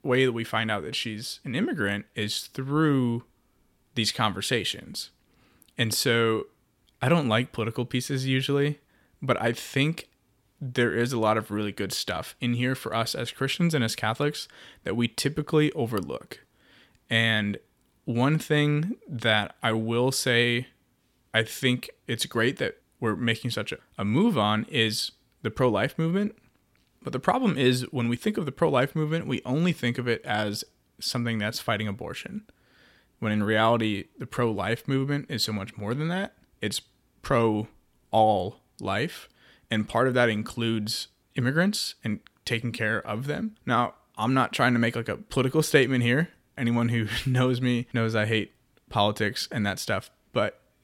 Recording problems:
none

